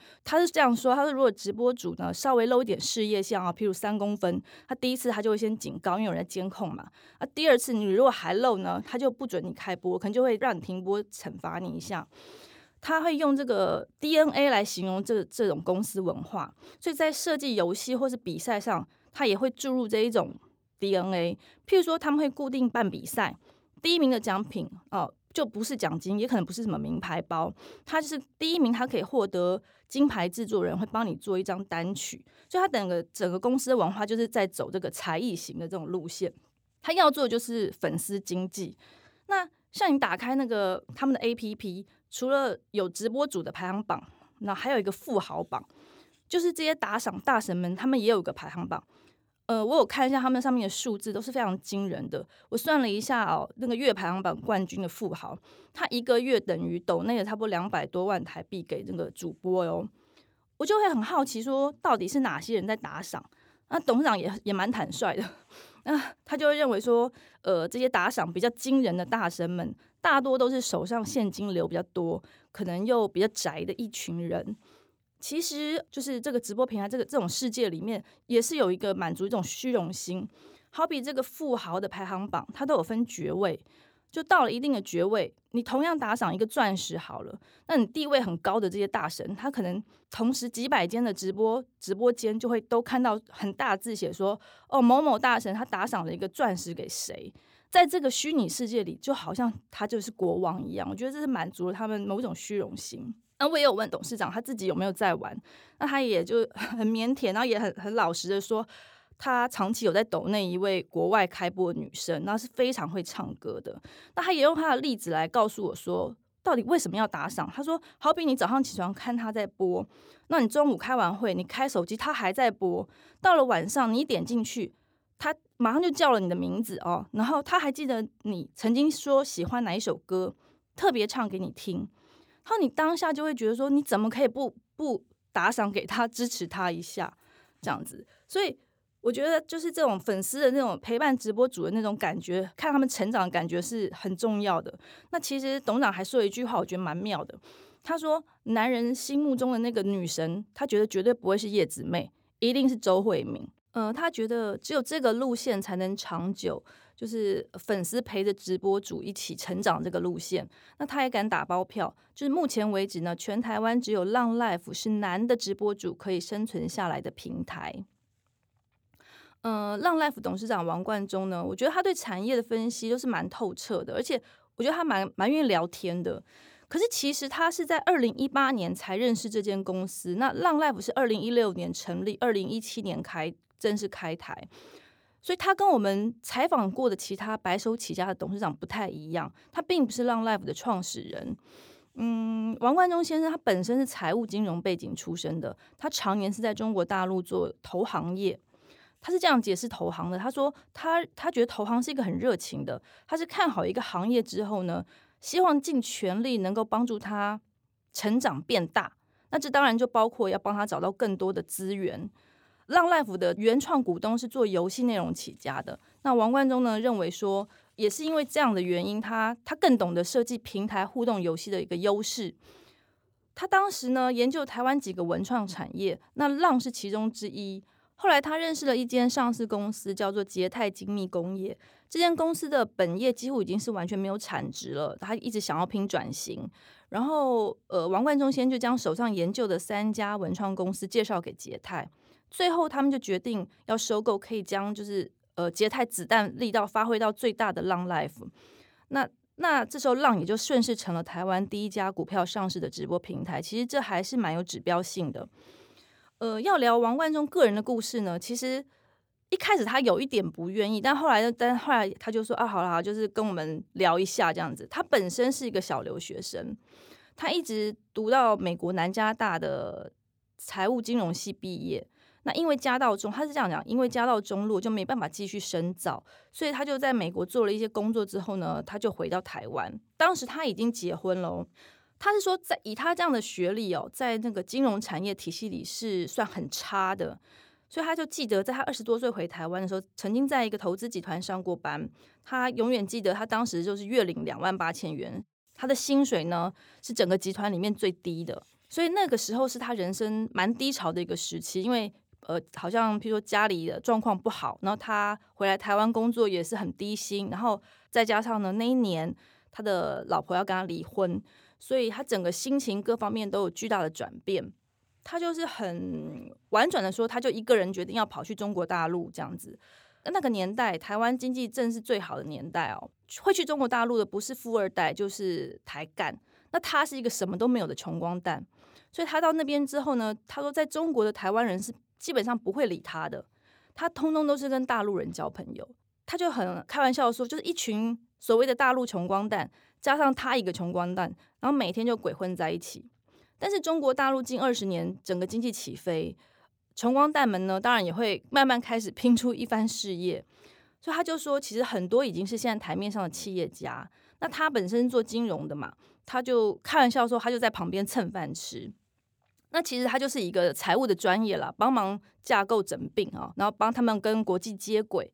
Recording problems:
none

